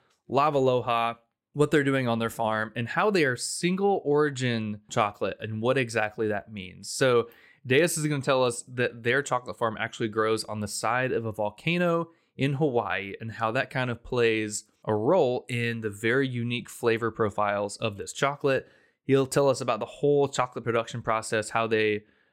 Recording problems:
none

